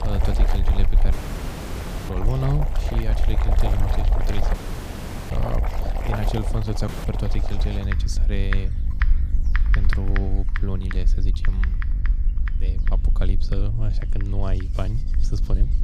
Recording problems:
household noises; loud; throughout; 6 dB below the speech
electrical hum; noticeable; throughout; 50 Hz, 15 dB below the speech
low rumble; noticeable; throughout; 10 dB below the speech
animal sounds; faint; throughout; 30 dB below the speech
audio cutting out; at 1 s for 1 s, at 4.5 s for 1 s and at 7 s

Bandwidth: 15 kHz